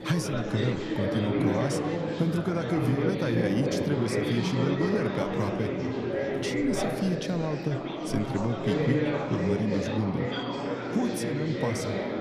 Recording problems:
chatter from many people; very loud; throughout; 1 dB above the speech

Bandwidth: 14.5 kHz